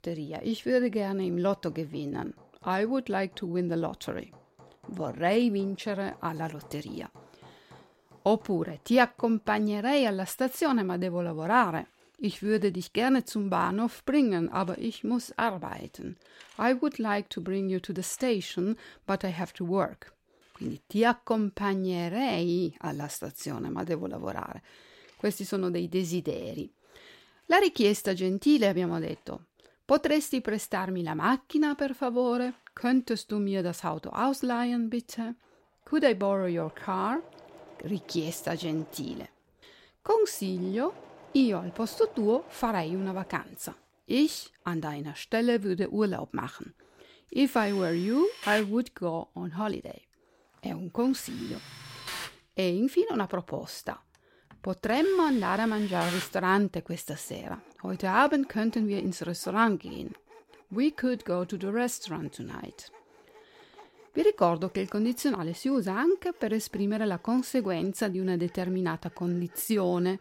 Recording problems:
machinery noise; noticeable; throughout; 20 dB below the speech

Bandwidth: 16 kHz